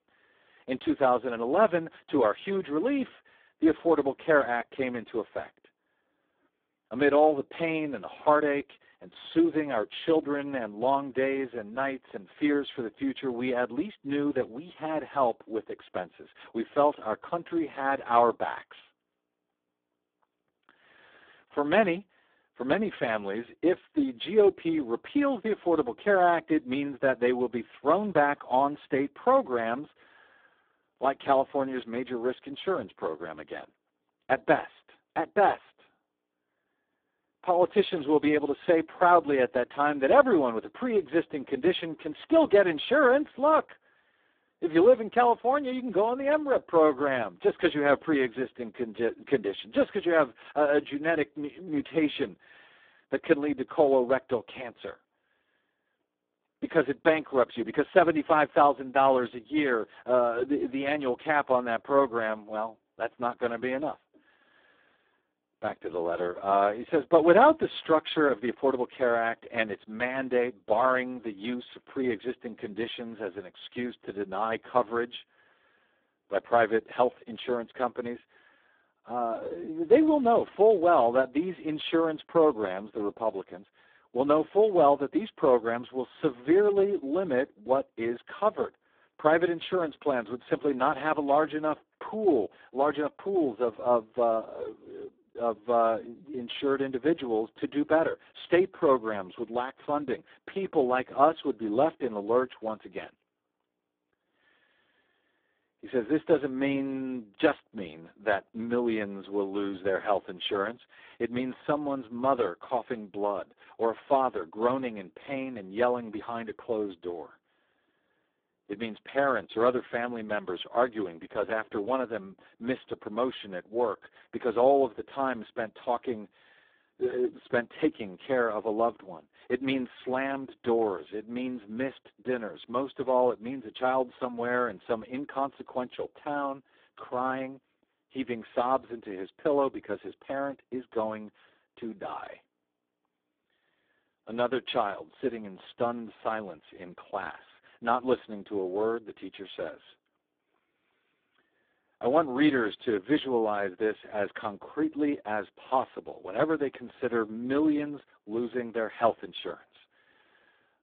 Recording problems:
phone-call audio; poor line

